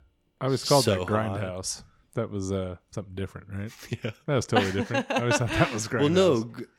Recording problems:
none

